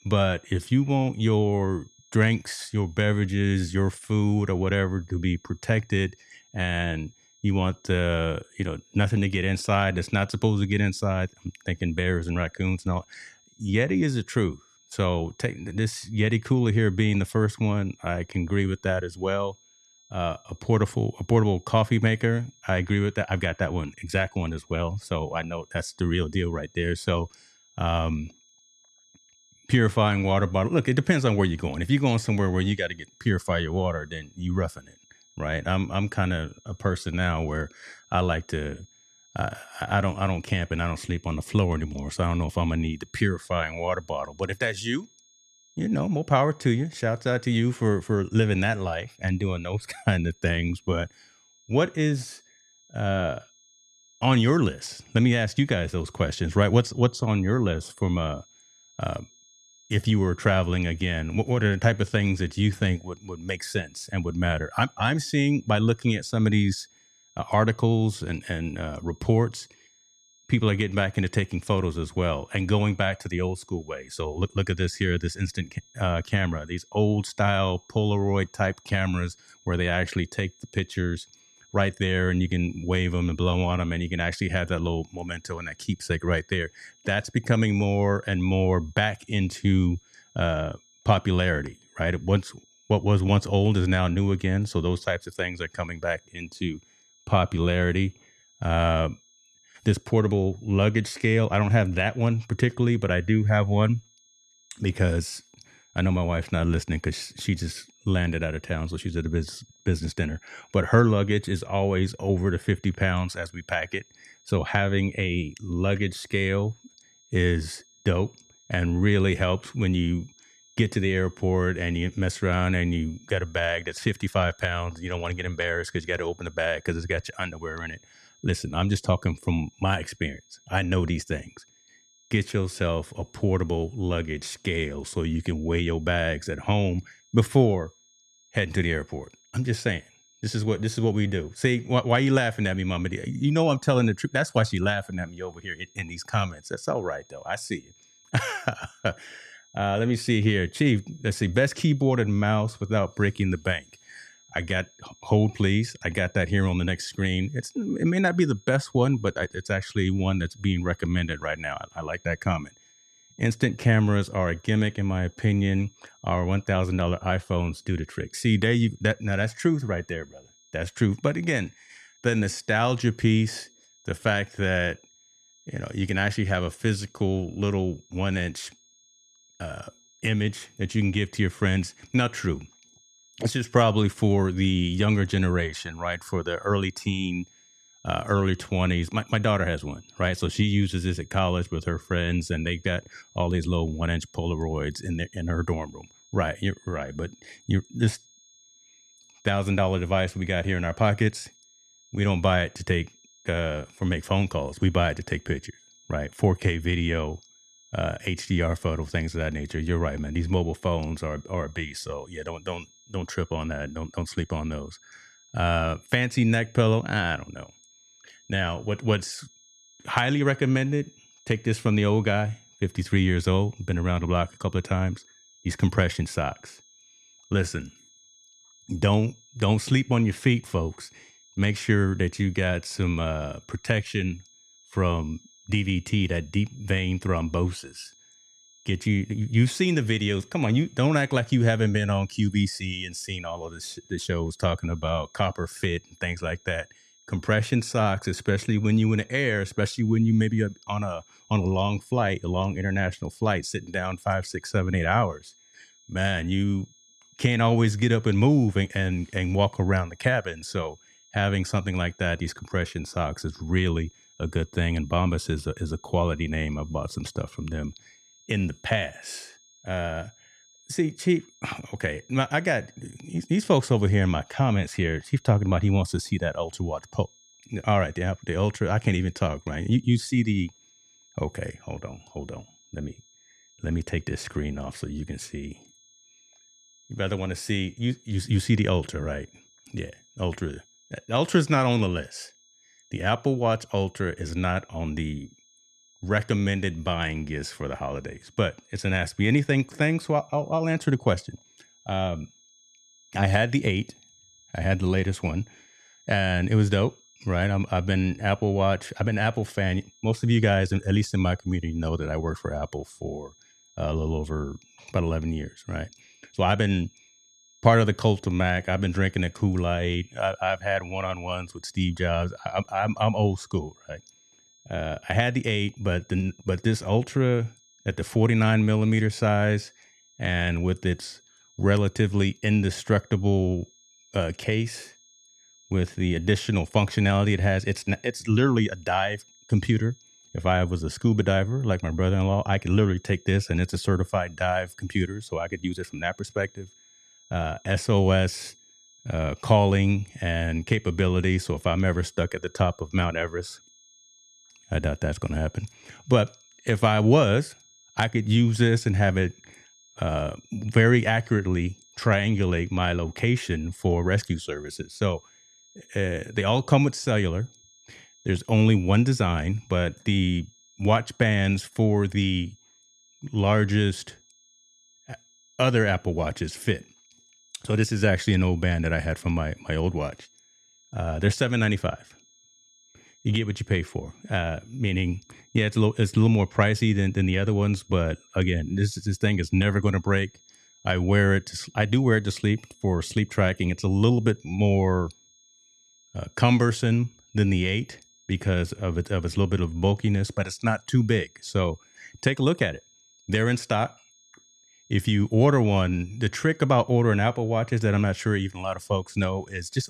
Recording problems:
high-pitched whine; faint; throughout; 6.5 kHz, 30 dB below the speech

